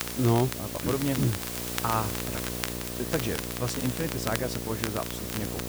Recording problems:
electrical hum; loud; throughout; 60 Hz, 9 dB below the speech
hiss; loud; throughout; 4 dB below the speech
crackle, like an old record; loud; 8 dB below the speech

